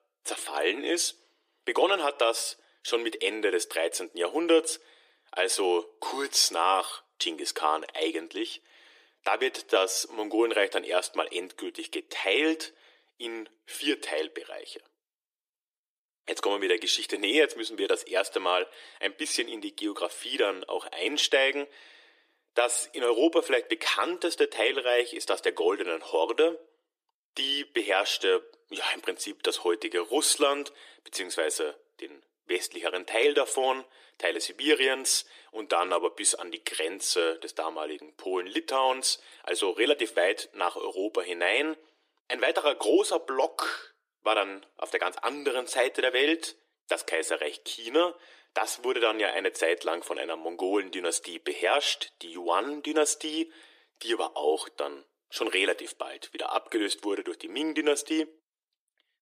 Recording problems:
thin; very; fading below 350 Hz

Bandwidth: 14.5 kHz